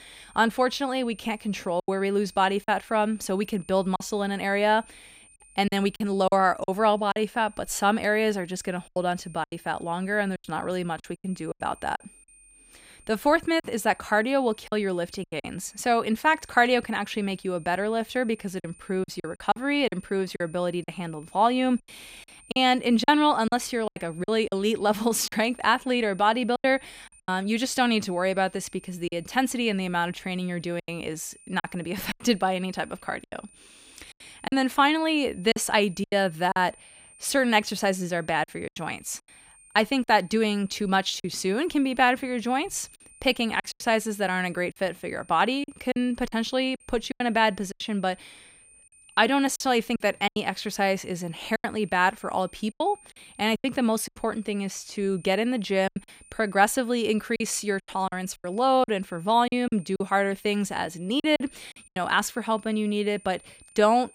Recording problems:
high-pitched whine; faint; throughout; 9 kHz, 25 dB below the speech
choppy; very; 7% of the speech affected

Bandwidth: 15.5 kHz